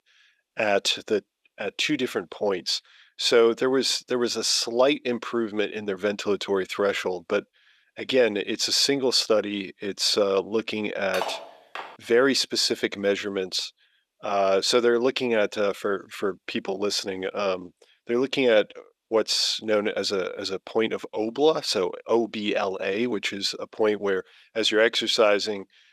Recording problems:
thin; somewhat; fading below 400 Hz
clattering dishes; noticeable; at 11 s; peak 7 dB below the speech

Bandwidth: 14.5 kHz